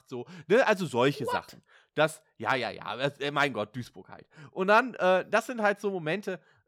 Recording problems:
none

